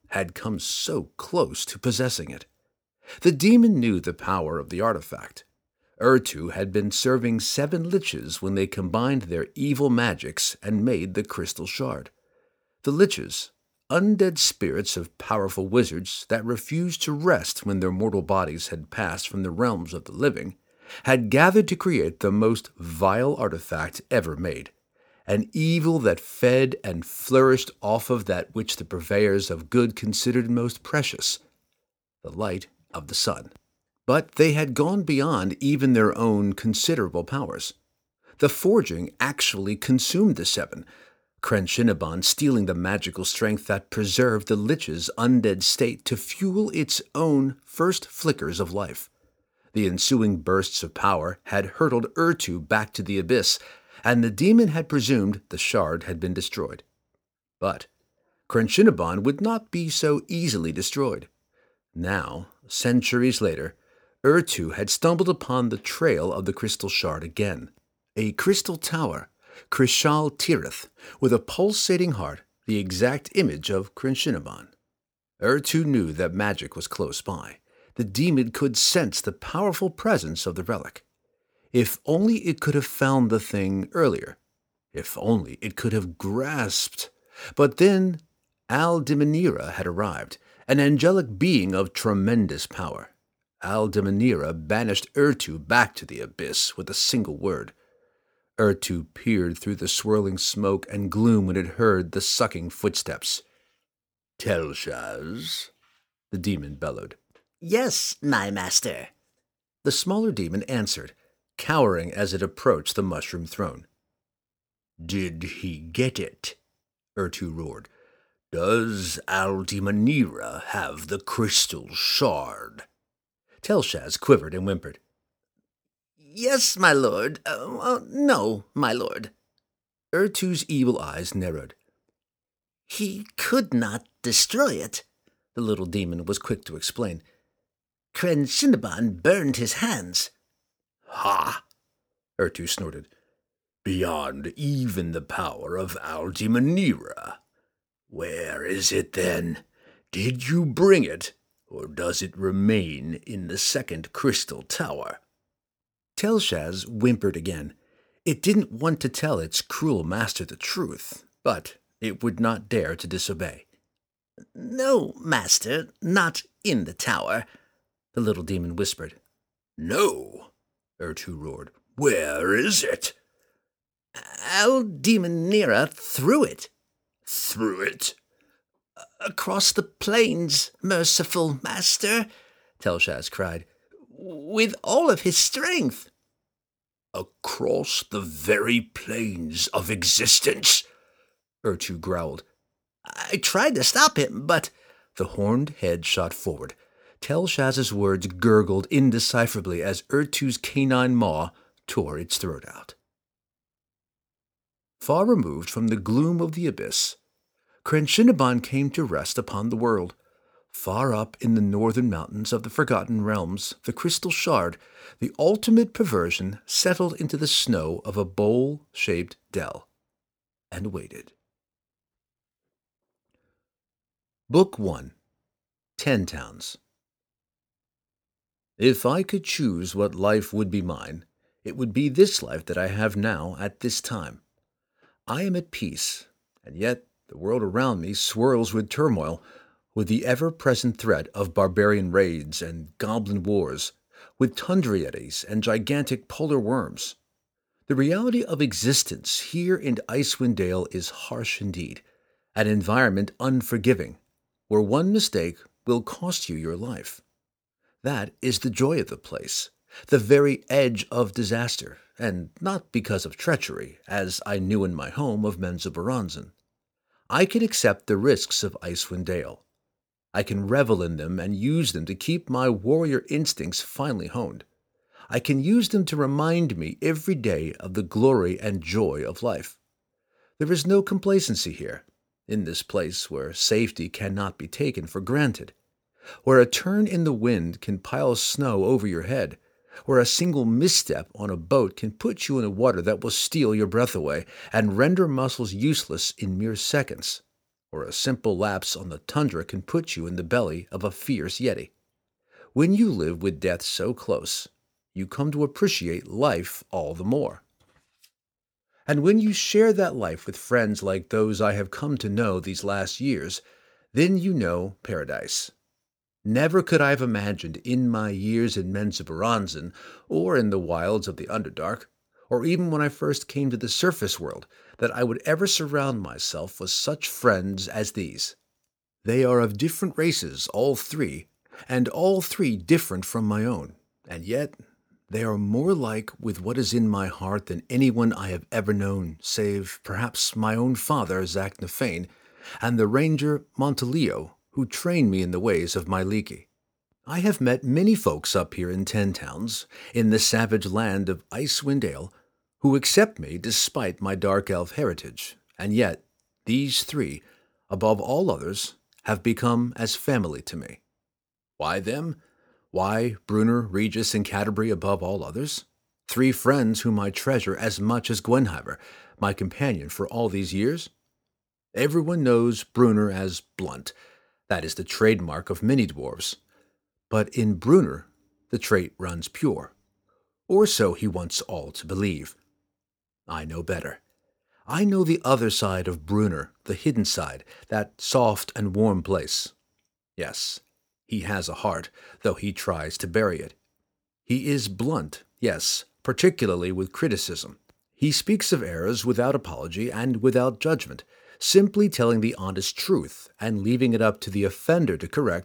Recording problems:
none

